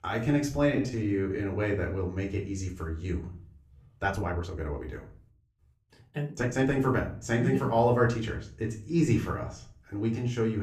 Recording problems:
room echo; slight; dies away in 0.4 s
off-mic speech; somewhat distant
uneven, jittery; strongly; from 0.5 to 6.5 s
abrupt cut into speech; at the end

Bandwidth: 14.5 kHz